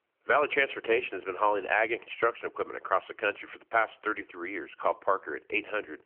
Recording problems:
phone-call audio

